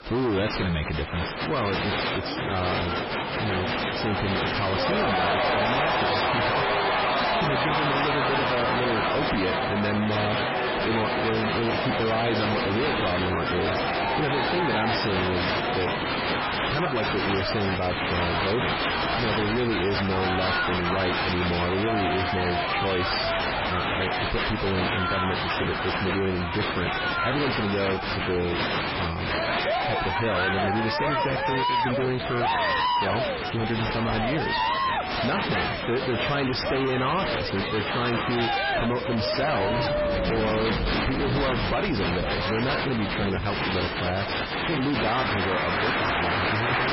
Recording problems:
distortion; heavy; 6 dB below the speech
garbled, watery; badly; nothing above 5.5 kHz
crowd noise; very loud; throughout; 2 dB above the speech
rain or running water; loud; from 17 s on; 10 dB below the speech

